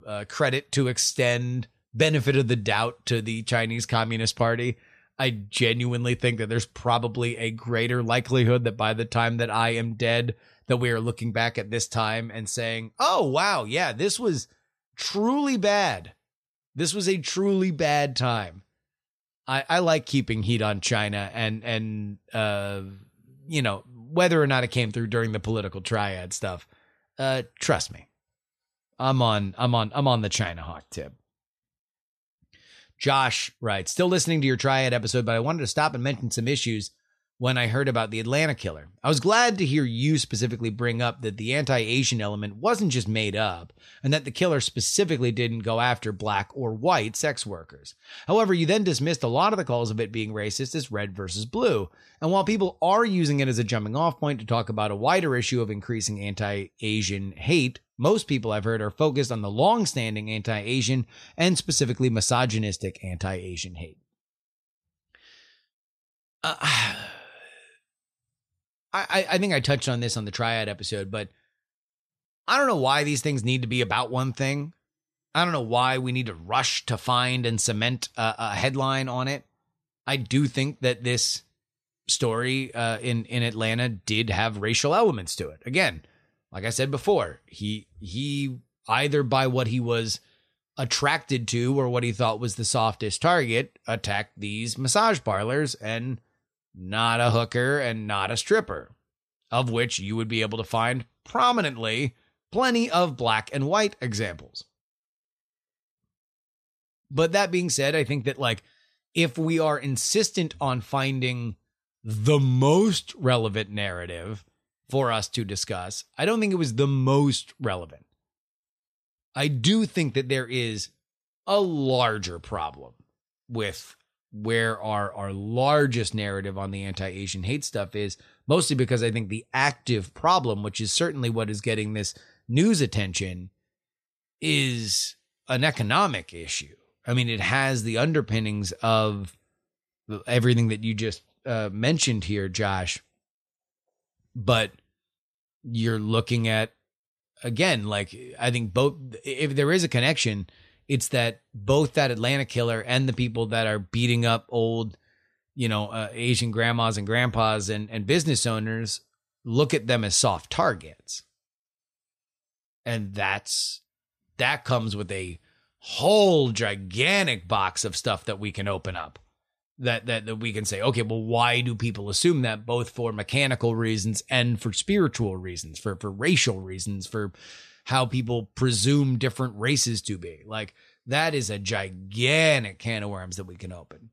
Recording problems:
none

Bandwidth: 14 kHz